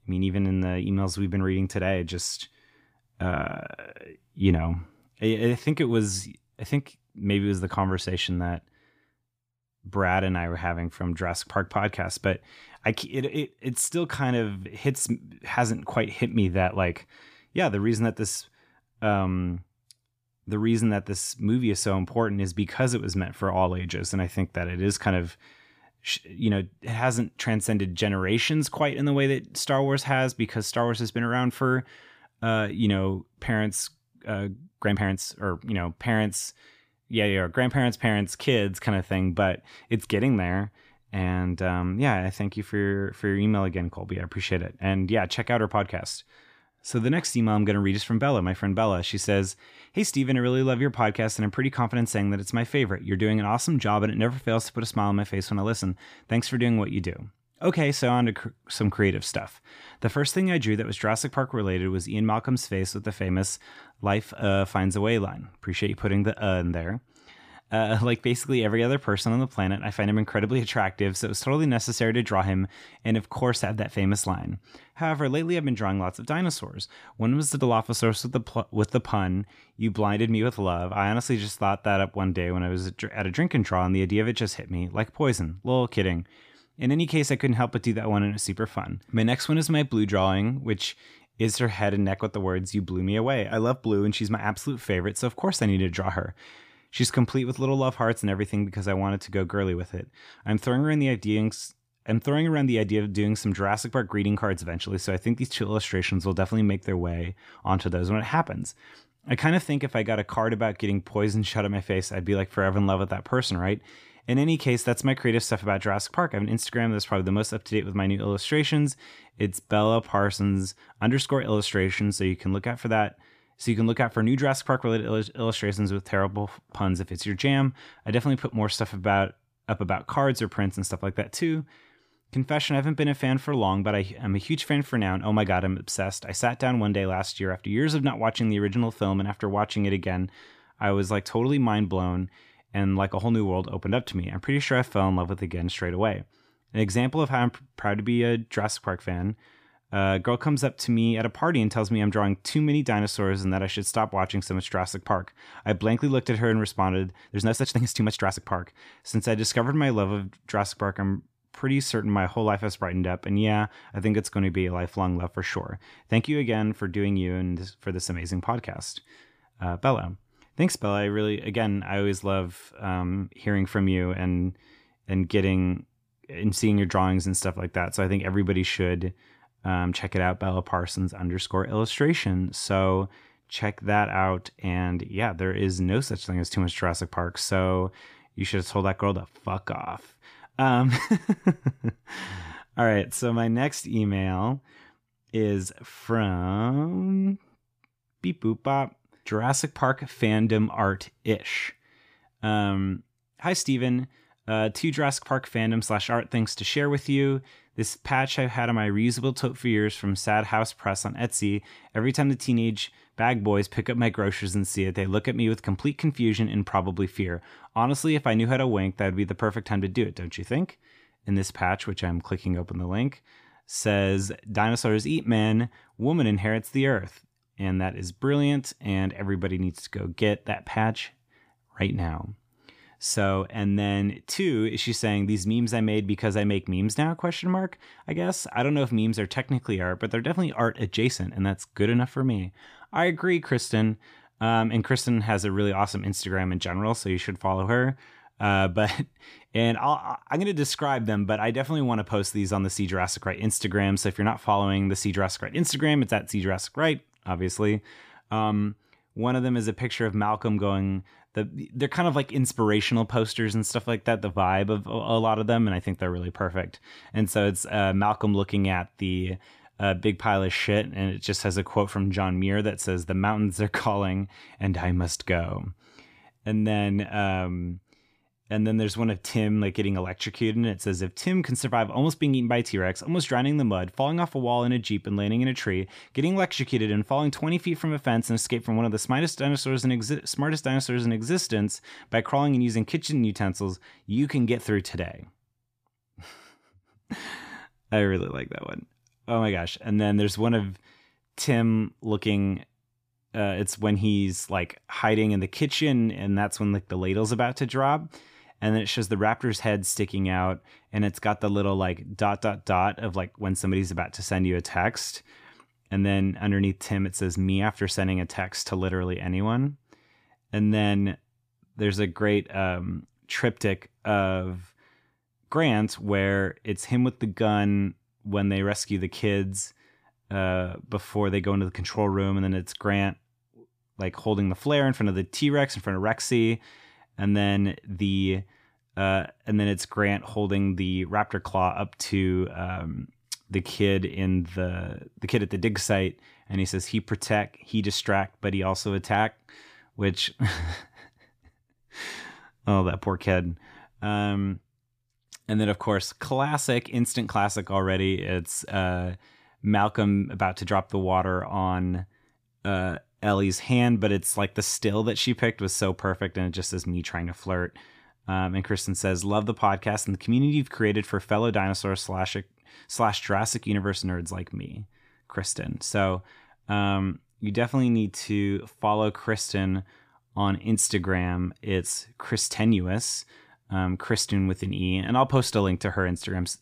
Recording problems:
uneven, jittery; strongly; from 34 s to 5:44

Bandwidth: 15 kHz